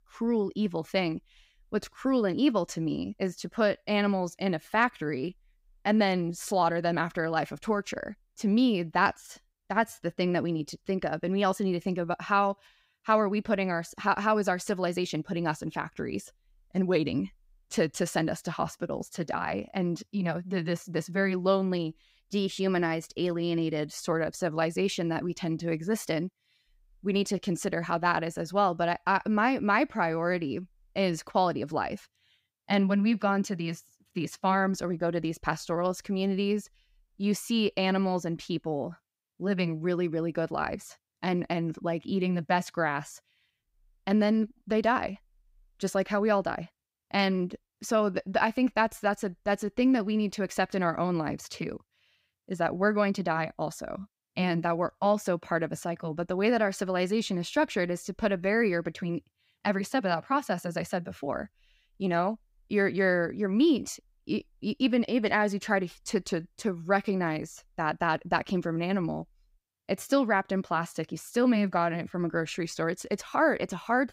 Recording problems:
none

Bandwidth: 15.5 kHz